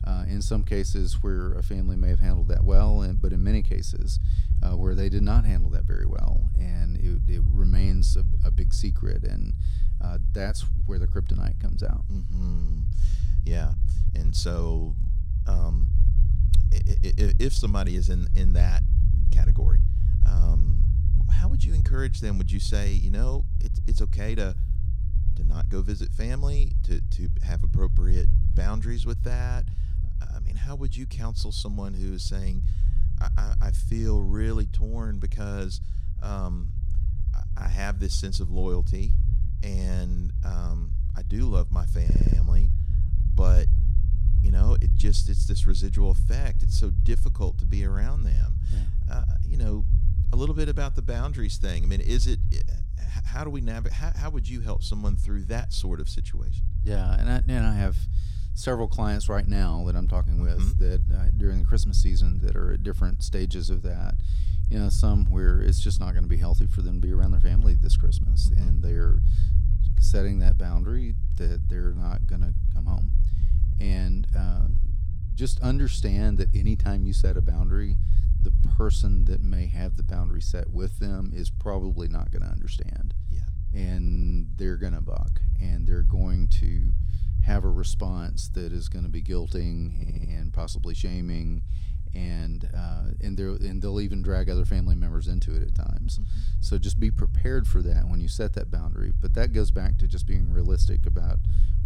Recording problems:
low rumble; loud; throughout; 8 dB below the speech
audio stuttering; at 42 s, at 1:24 and at 1:30

